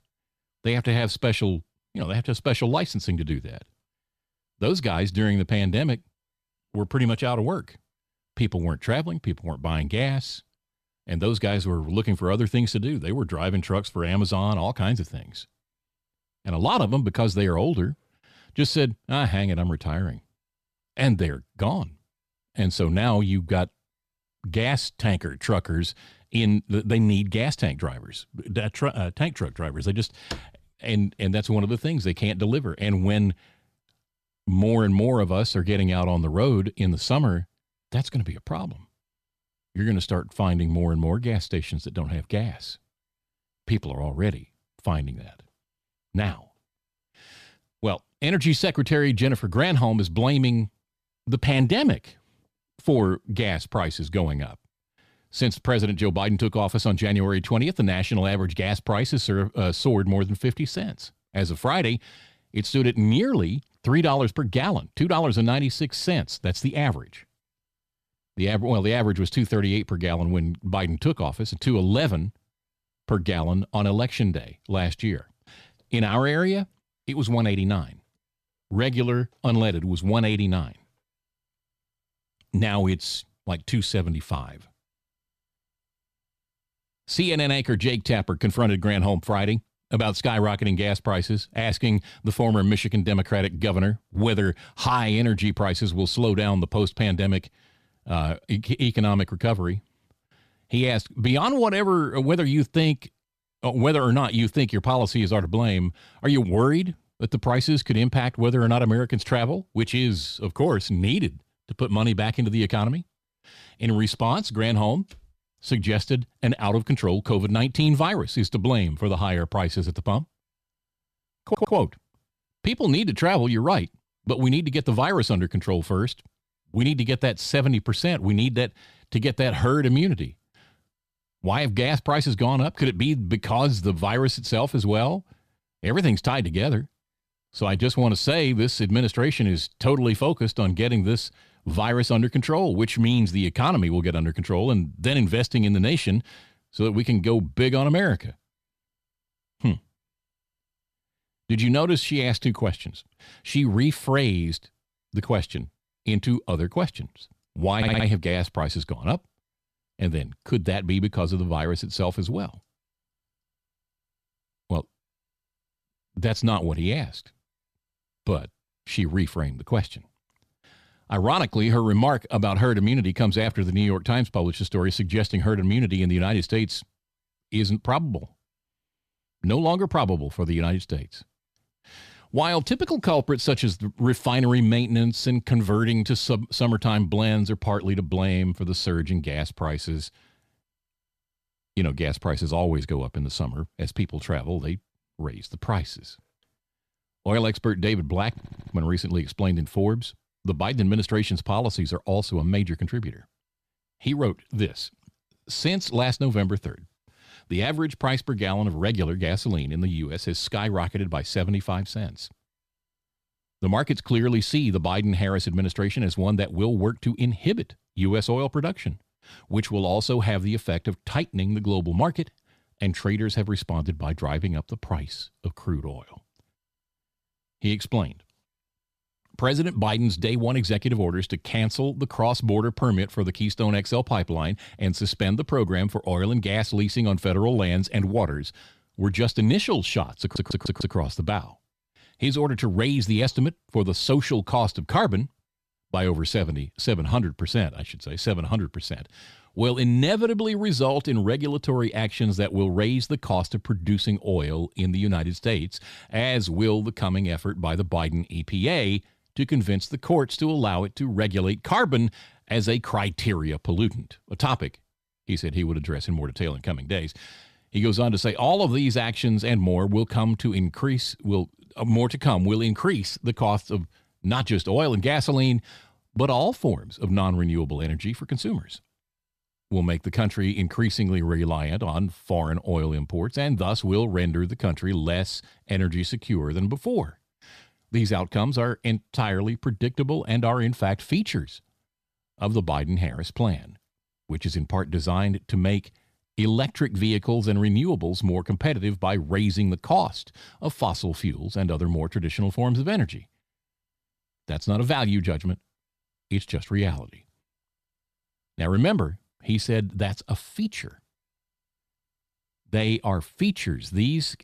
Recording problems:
audio stuttering; 4 times, first at 2:01

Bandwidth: 14.5 kHz